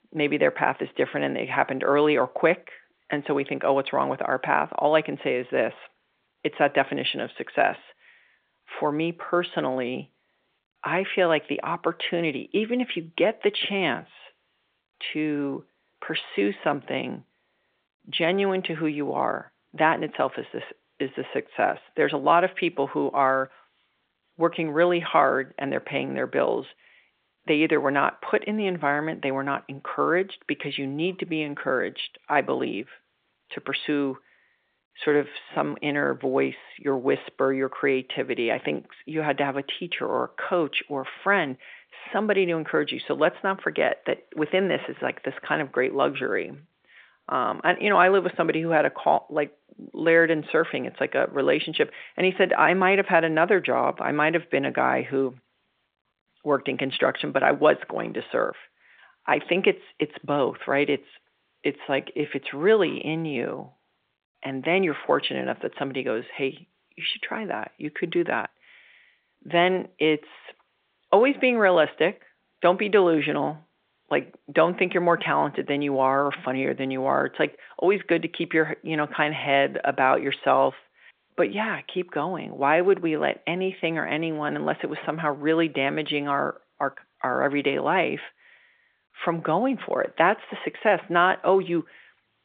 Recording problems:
phone-call audio

